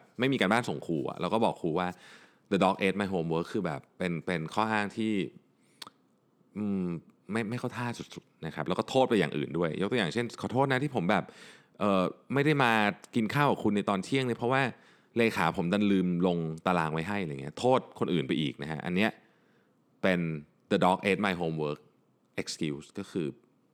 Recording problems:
none

